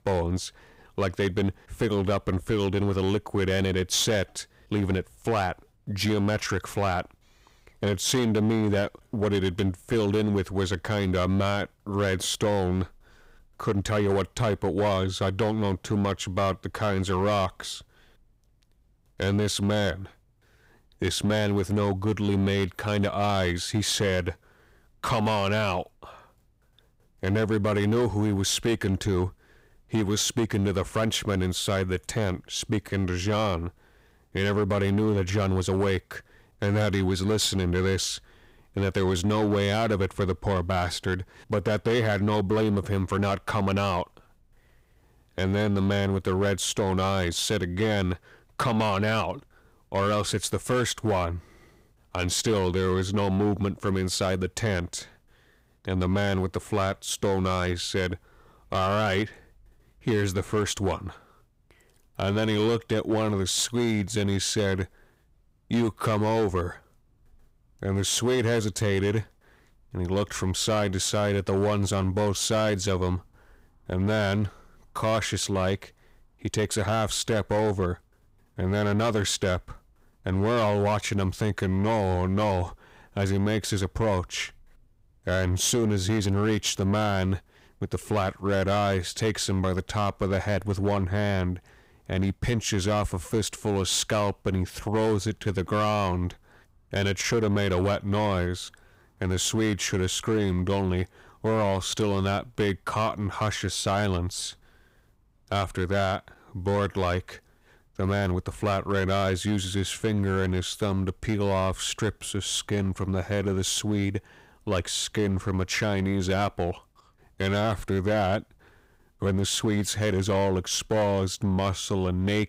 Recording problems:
distortion; slight; 10% of the sound clipped

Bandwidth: 15.5 kHz